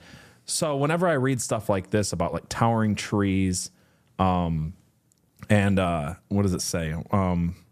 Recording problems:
none

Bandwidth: 14.5 kHz